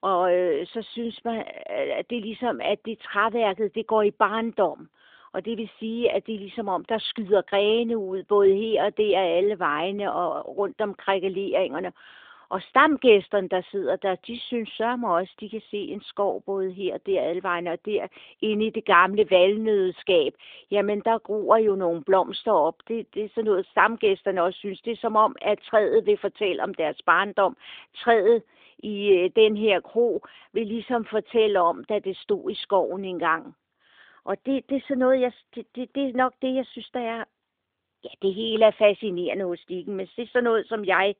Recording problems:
phone-call audio

